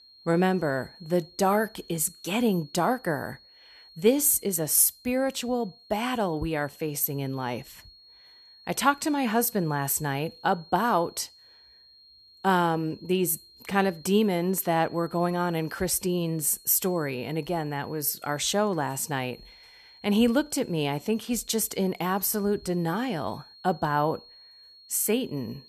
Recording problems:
high-pitched whine; faint; throughout; 4.5 kHz, 25 dB below the speech

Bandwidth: 13.5 kHz